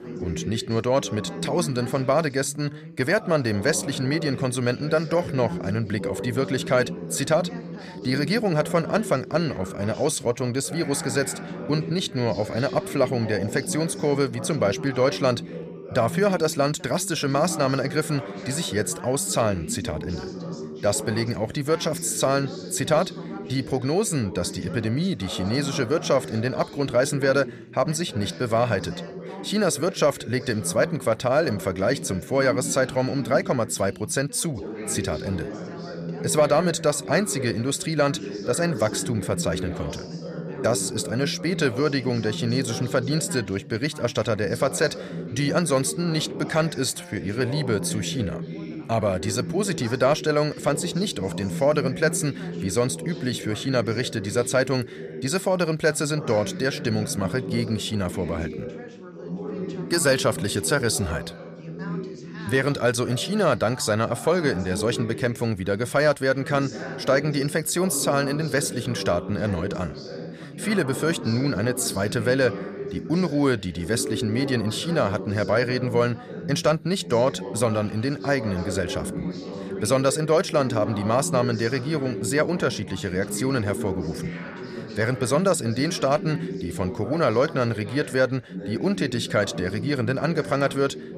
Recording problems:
background chatter; loud; throughout; 2 voices, 10 dB below the speech

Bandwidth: 15 kHz